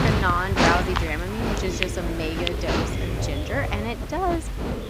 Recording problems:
animal sounds; very loud; throughout; 1 dB above the speech
voice in the background; loud; throughout; 9 dB below the speech

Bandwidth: 15.5 kHz